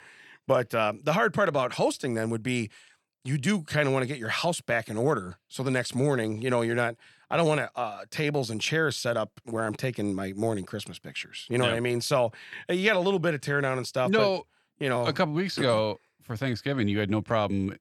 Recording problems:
none

